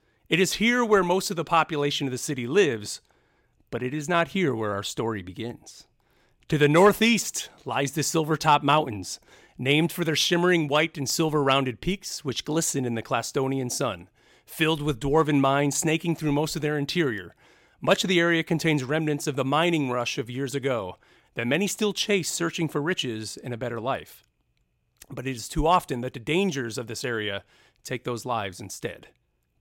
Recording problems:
none

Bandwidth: 16.5 kHz